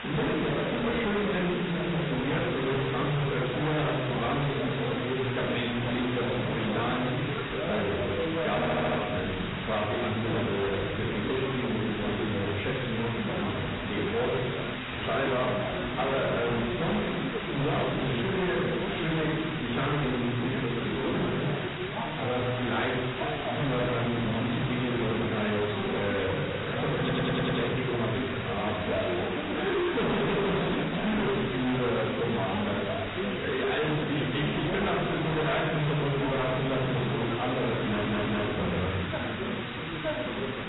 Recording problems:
distortion; heavy; 25% of the sound clipped
off-mic speech; far
garbled, watery; badly; nothing above 4 kHz
room echo; noticeable; dies away in 0.9 s
background chatter; loud; throughout; 3 voices, 5 dB below the speech
hiss; loud; throughout; 7 dB below the speech
audio stuttering; at 8.5 s, at 27 s and at 38 s

